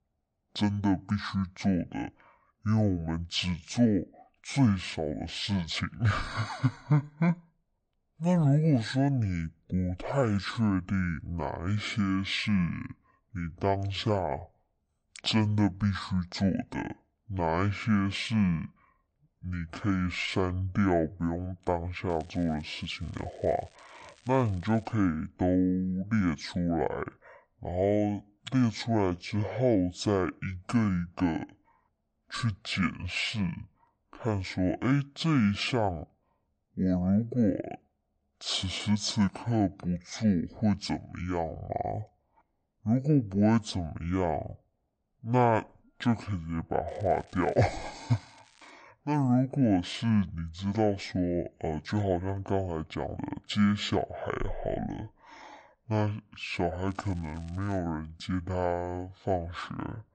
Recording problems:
wrong speed and pitch; too slow and too low; 0.5 times normal speed
crackling; faint; from 22 to 25 s, from 47 to 49 s and at 57 s; 30 dB below the speech

